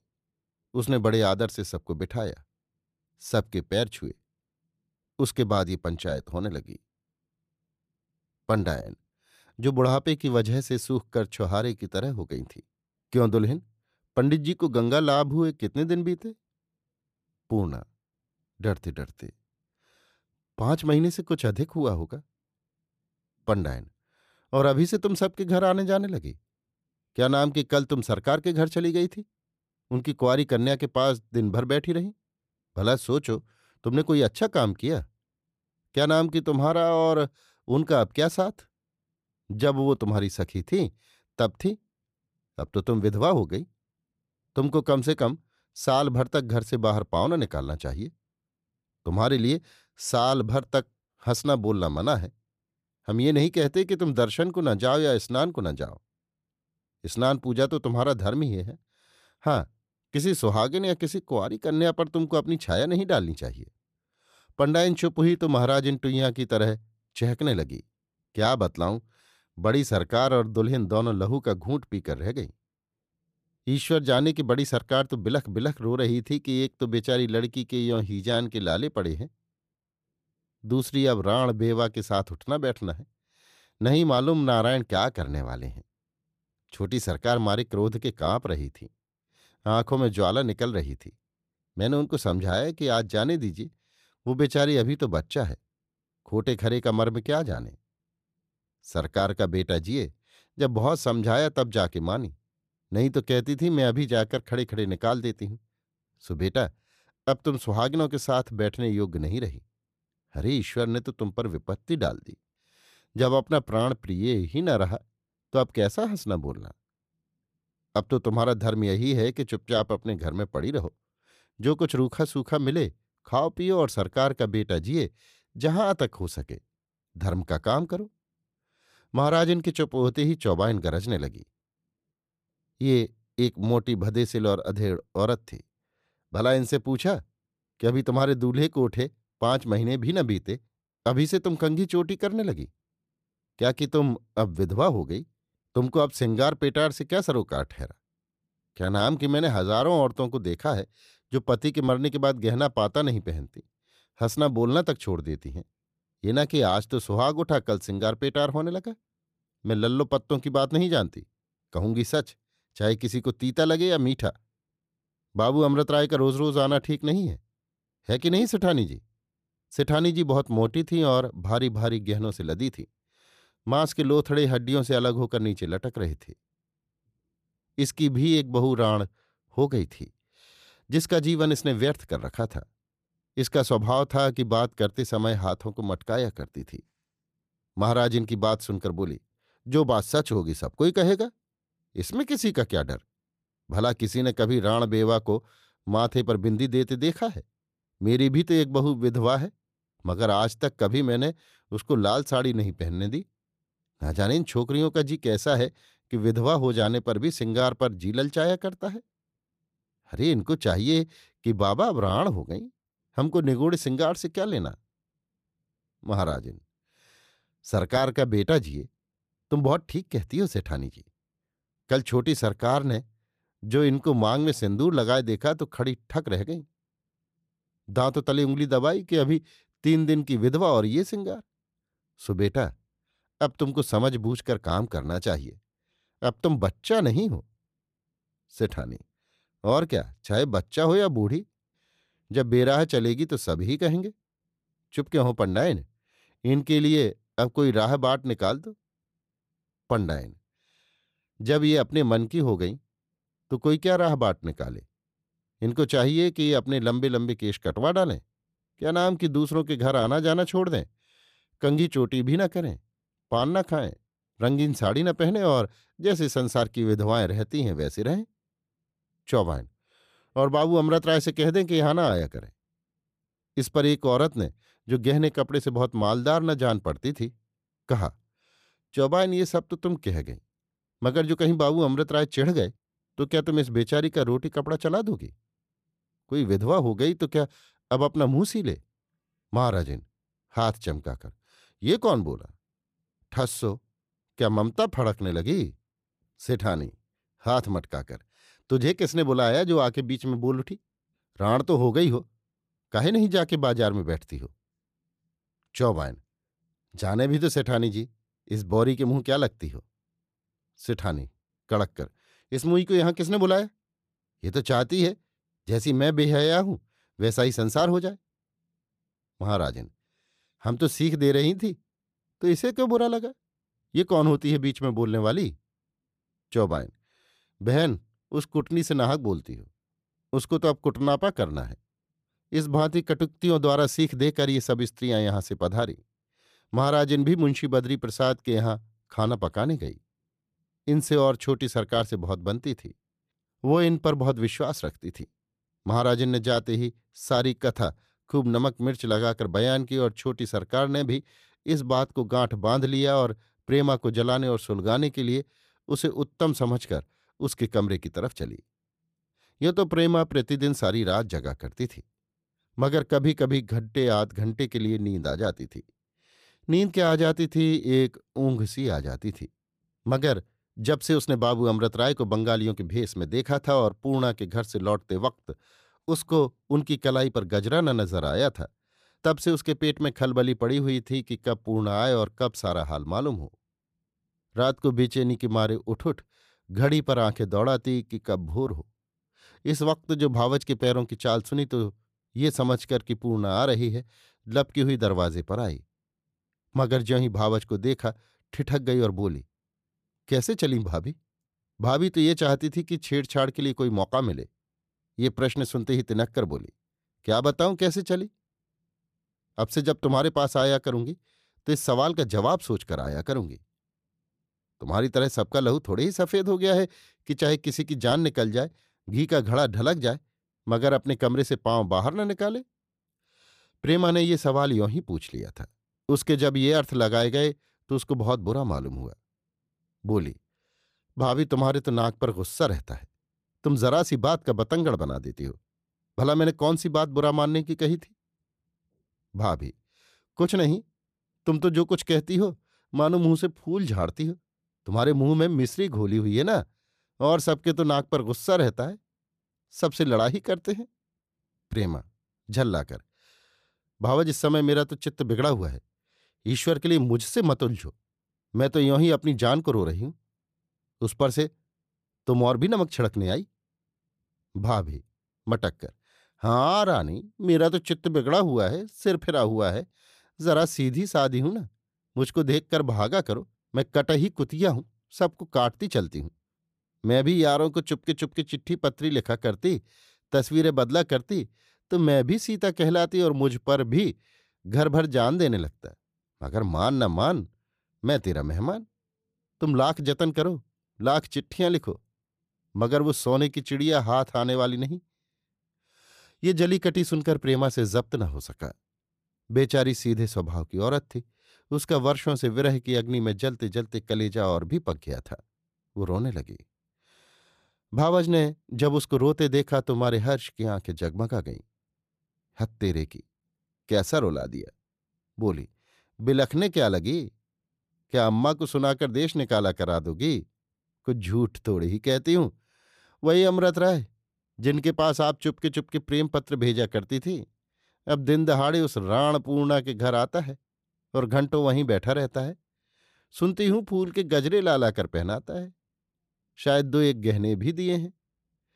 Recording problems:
none

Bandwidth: 14.5 kHz